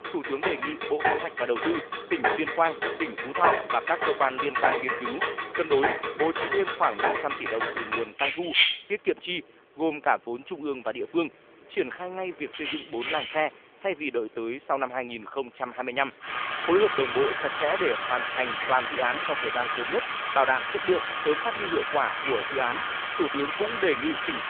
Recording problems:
phone-call audio; nothing above 3.5 kHz
household noises; loud; throughout; as loud as the speech

